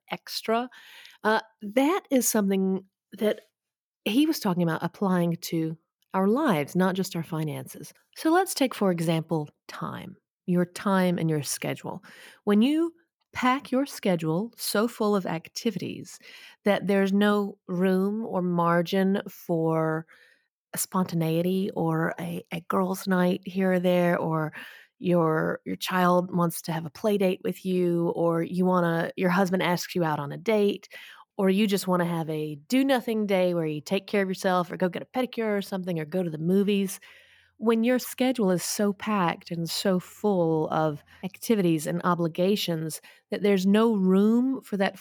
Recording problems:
none

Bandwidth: 18.5 kHz